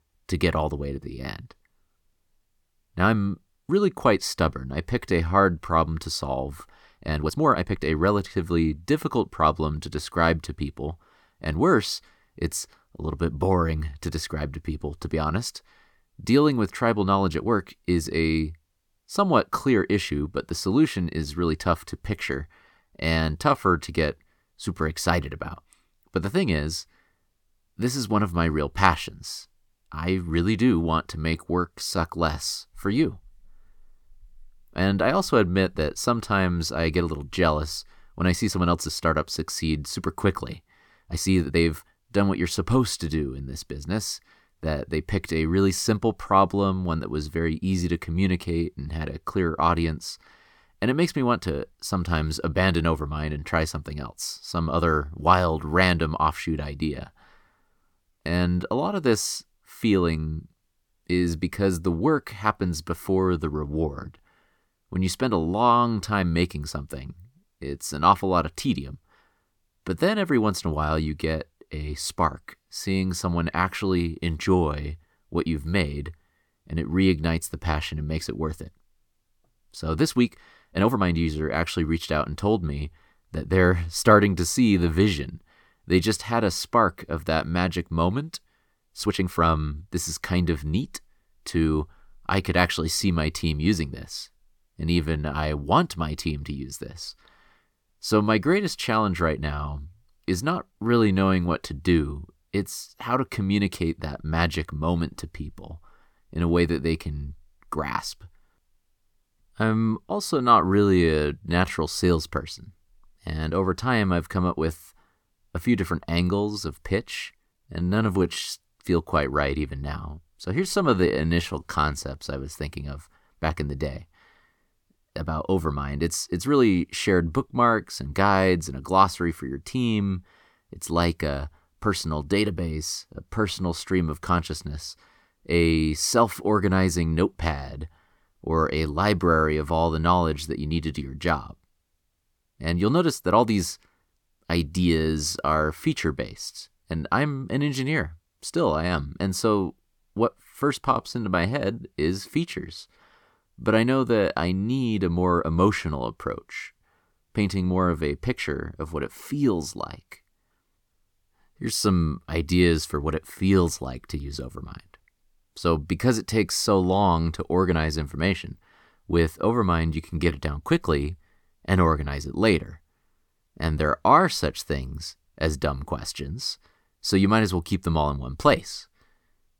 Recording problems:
uneven, jittery; strongly; from 1 s to 2:50

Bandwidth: 18.5 kHz